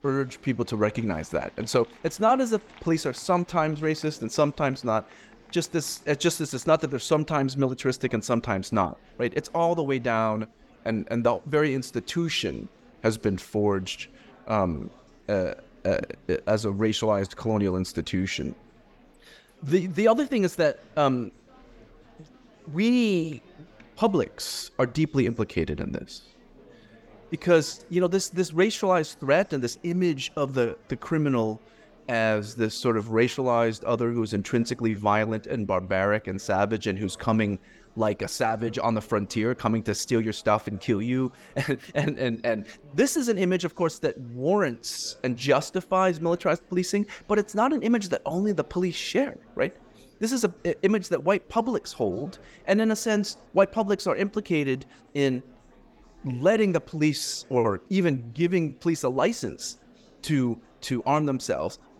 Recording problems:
murmuring crowd; faint; throughout; 30 dB below the speech

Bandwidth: 17 kHz